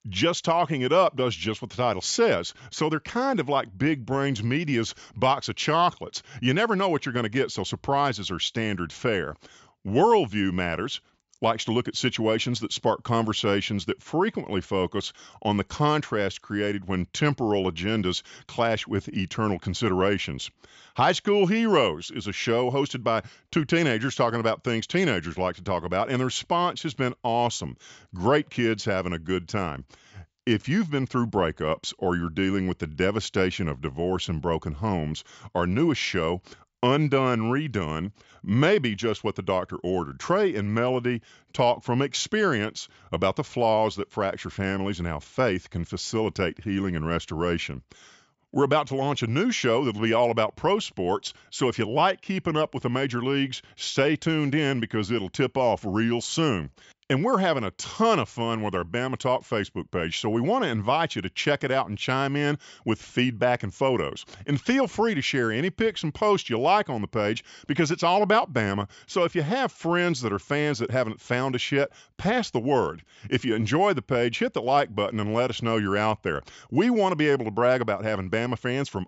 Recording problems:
high frequencies cut off; noticeable; nothing above 8 kHz

